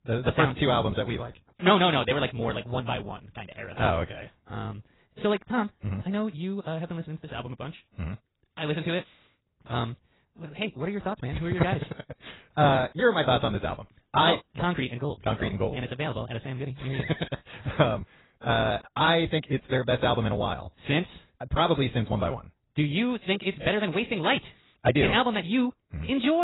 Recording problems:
garbled, watery; badly; nothing above 4 kHz
wrong speed, natural pitch; too fast; 1.7 times normal speed
abrupt cut into speech; at the end

